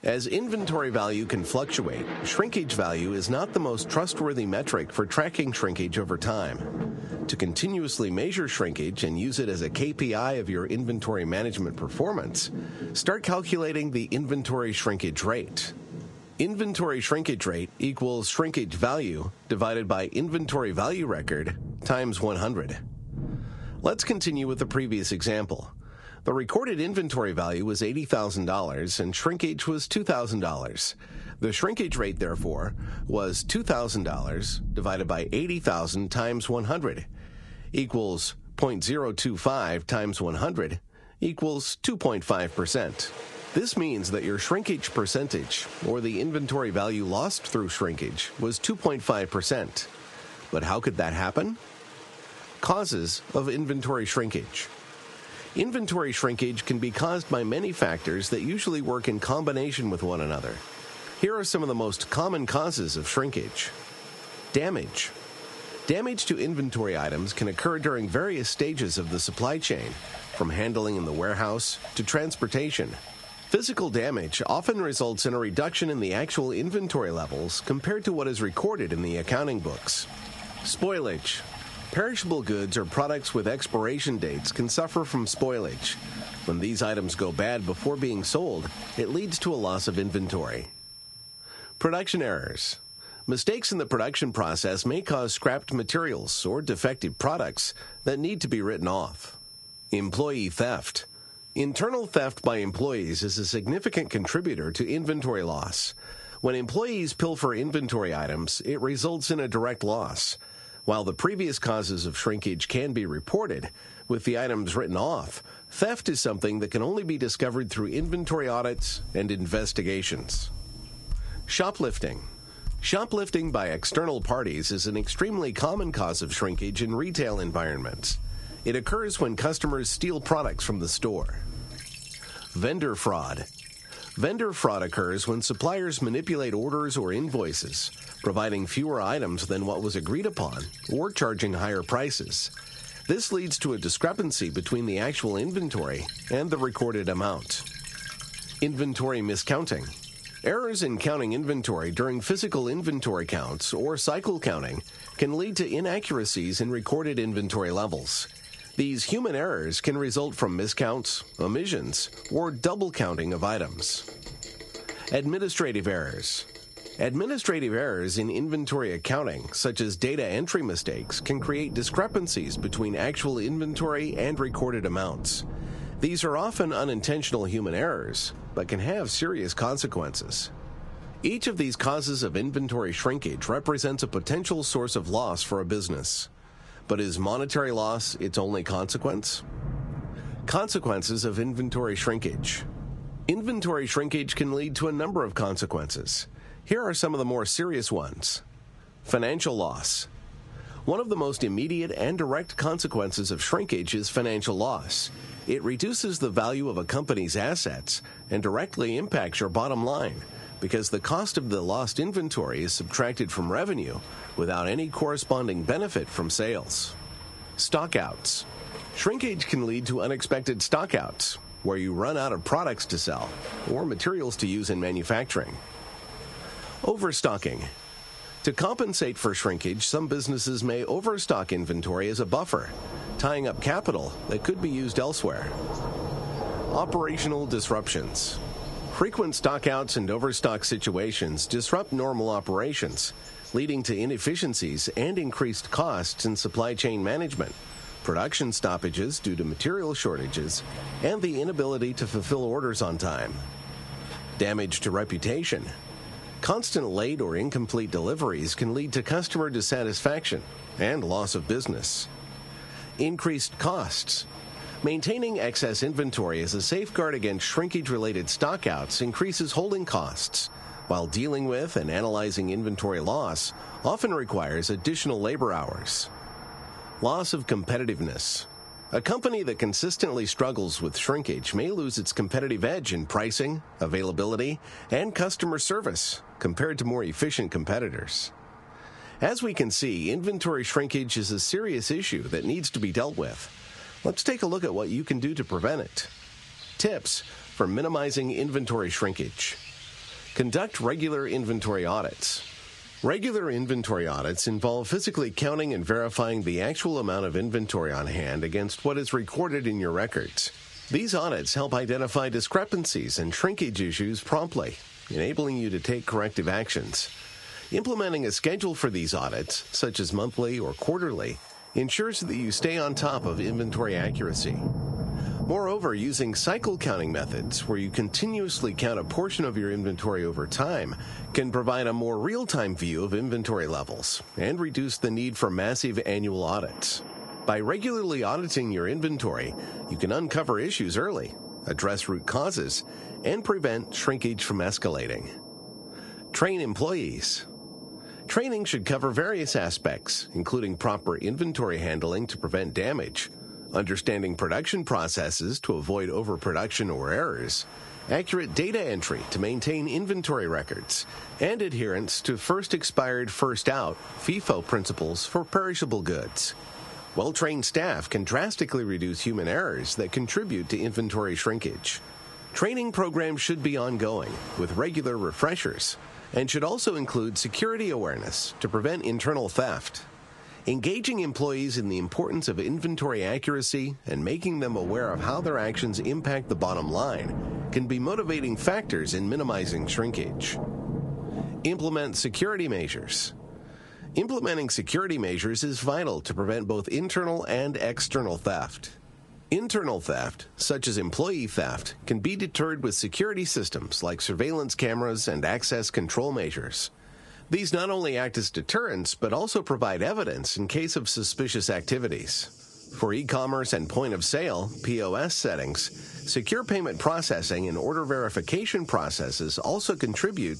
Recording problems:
squashed, flat; heavily, background pumping
garbled, watery; slightly; nothing above 10.5 kHz
rain or running water; noticeable; throughout; 15 dB below the speech
high-pitched whine; faint; from 56 s to 2:55, from 3:21 to 4:43 and from 5:17 to 6:16; 5.5 kHz, 20 dB below the speech

